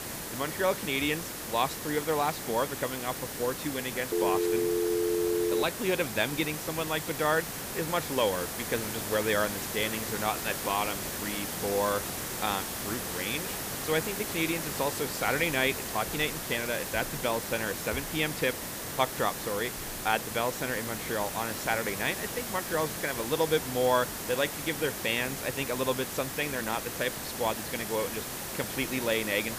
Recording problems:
hiss; loud; throughout; 3 dB below the speech
phone ringing; loud; from 4 to 5.5 s; peak 3 dB above the speech

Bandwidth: 15 kHz